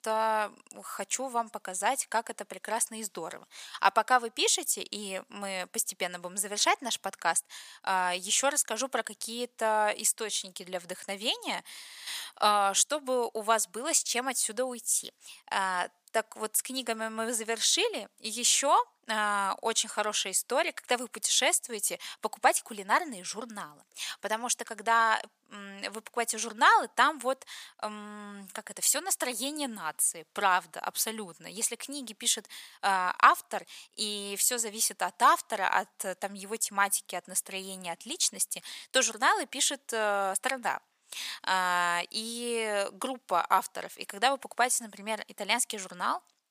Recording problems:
thin; very; fading below 650 Hz

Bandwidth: 15 kHz